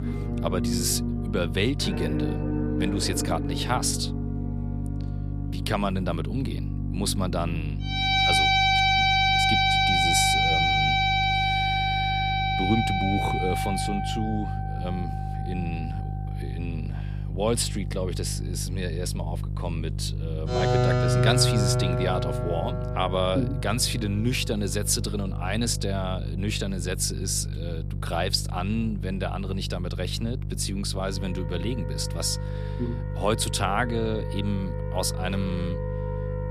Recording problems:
background music; very loud; throughout; 4 dB above the speech
electrical hum; noticeable; throughout; 50 Hz, 15 dB below the speech

